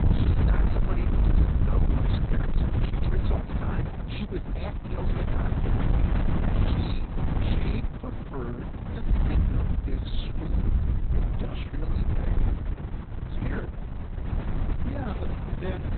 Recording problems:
garbled, watery; badly; nothing above 4 kHz
distortion; slight; 10 dB below the speech
wind noise on the microphone; heavy; 2 dB above the speech
electrical hum; noticeable; throughout; 60 Hz, 20 dB below the speech

